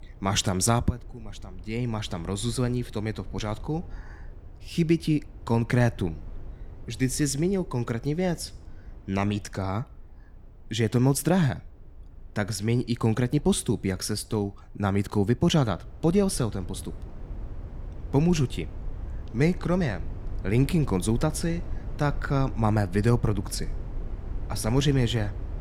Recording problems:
low rumble; faint; throughout; 20 dB below the speech

